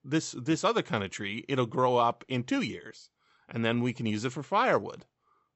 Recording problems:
high frequencies cut off; noticeable; nothing above 8 kHz

